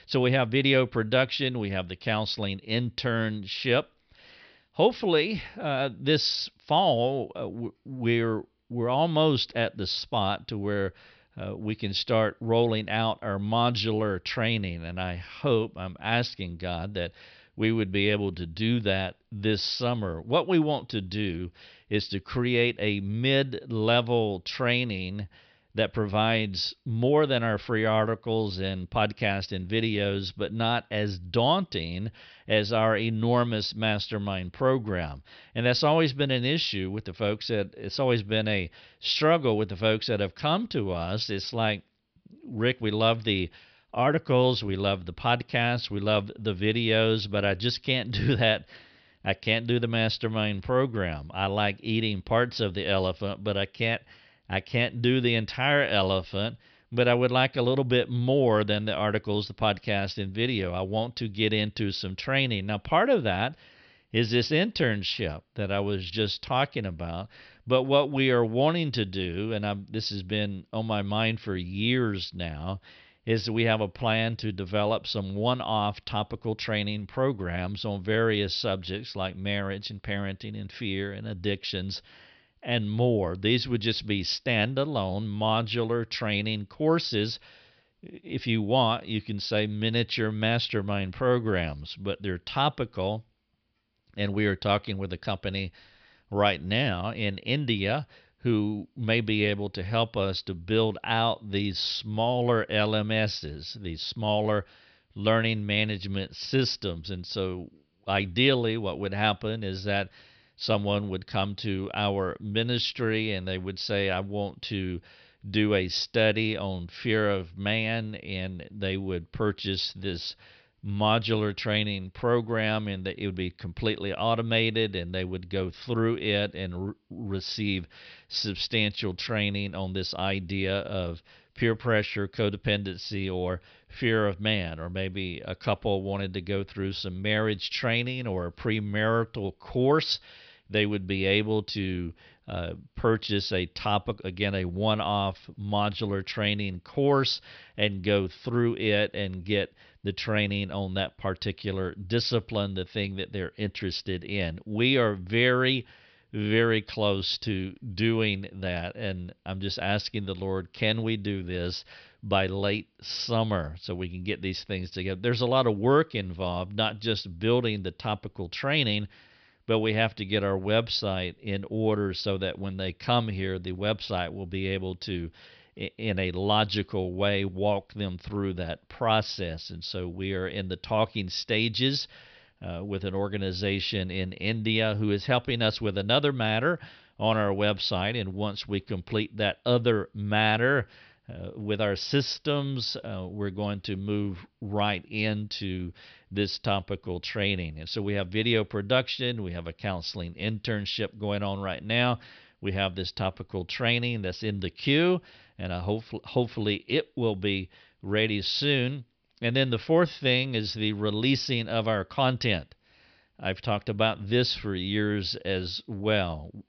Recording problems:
high frequencies cut off; noticeable; nothing above 5.5 kHz

